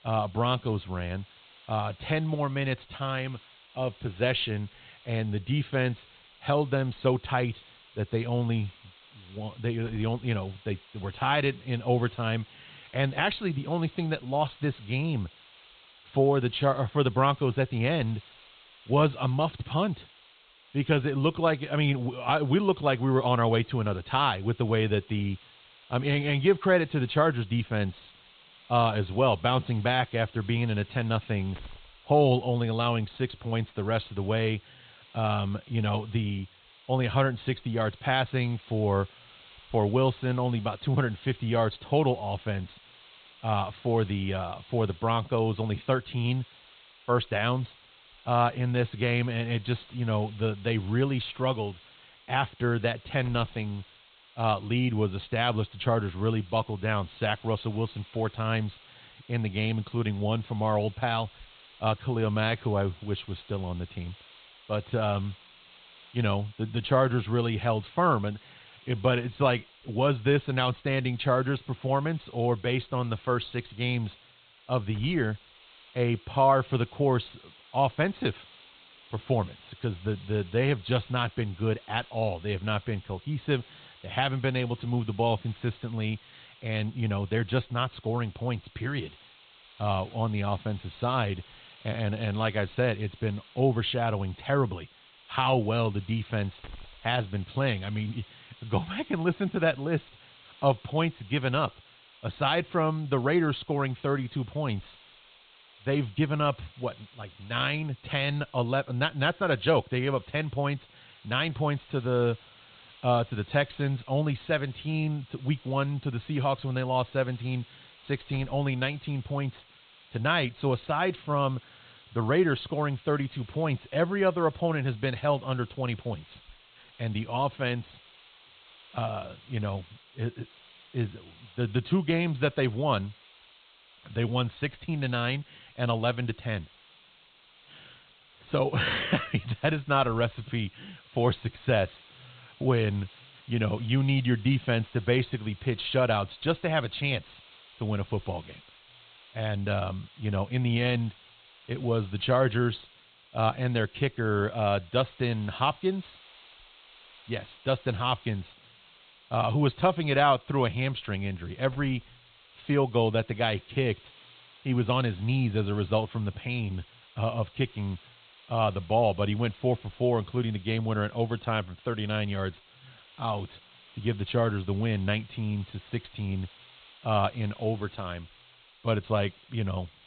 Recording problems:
high frequencies cut off; severe; nothing above 4 kHz
hiss; faint; throughout; 25 dB below the speech

